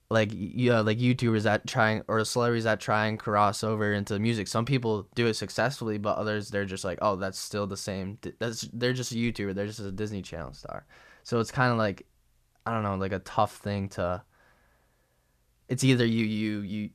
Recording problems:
none

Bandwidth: 14.5 kHz